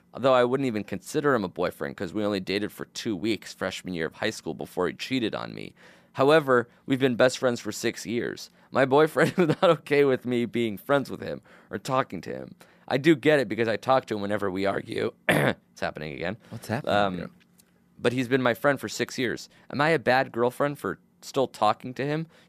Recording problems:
none

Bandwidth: 14.5 kHz